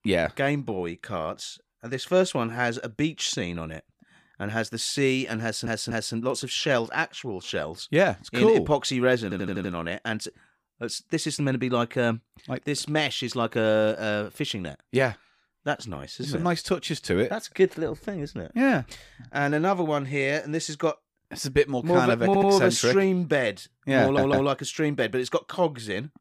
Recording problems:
audio stuttering; 4 times, first at 5.5 s

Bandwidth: 15 kHz